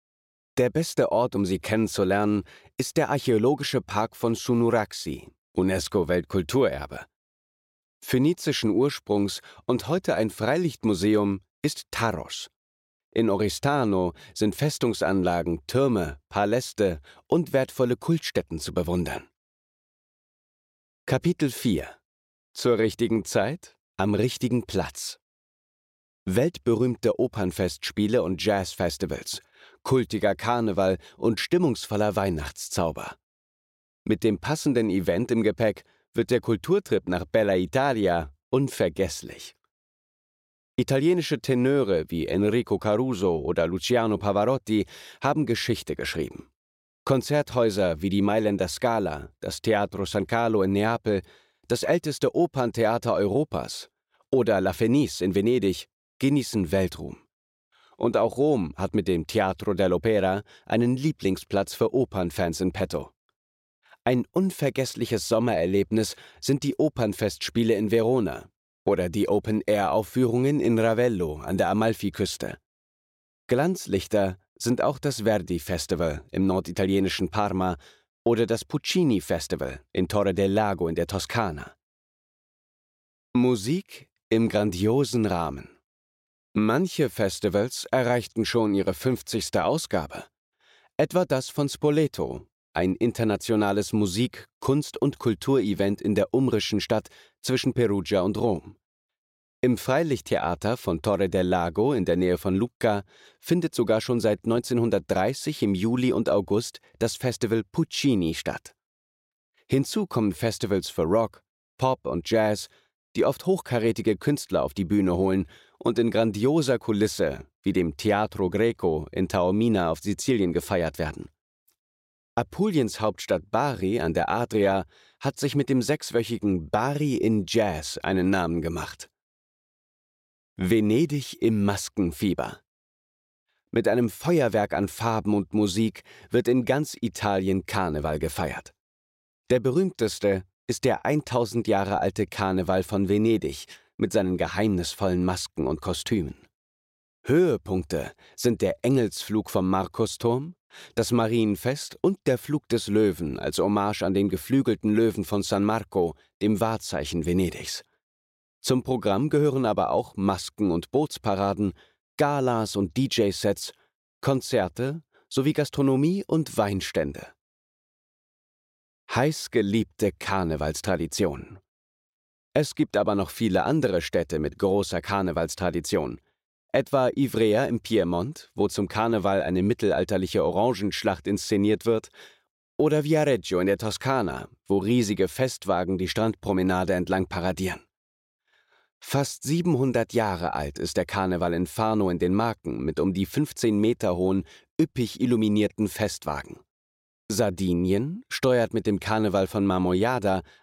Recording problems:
none

